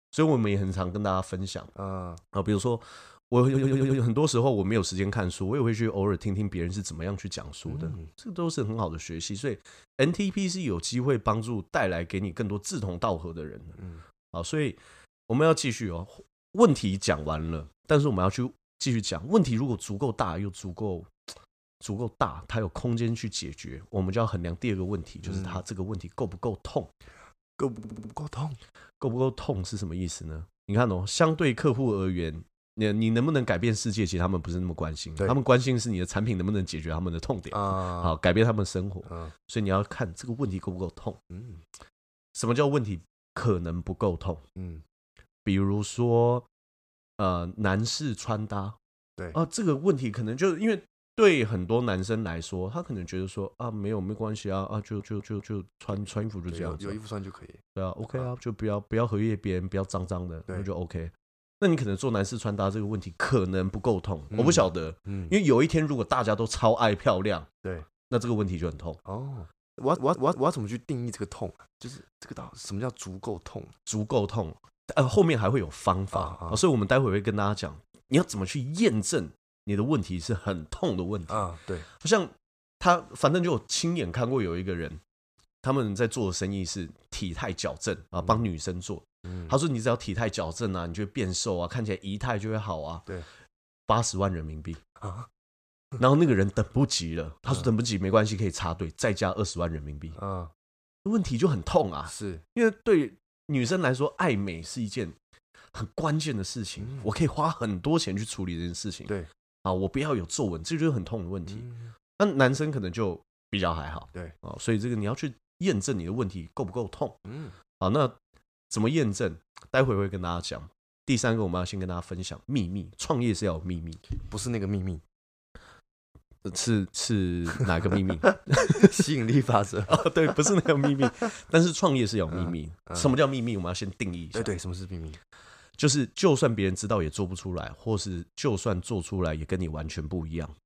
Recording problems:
audio stuttering; 4 times, first at 3.5 s

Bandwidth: 14.5 kHz